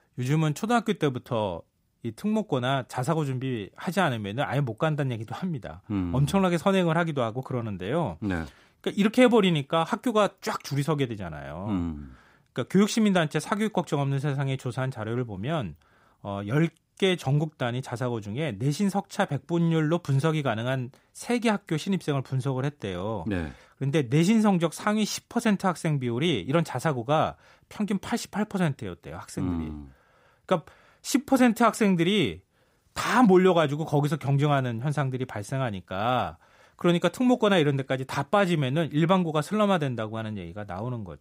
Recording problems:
none

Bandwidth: 15.5 kHz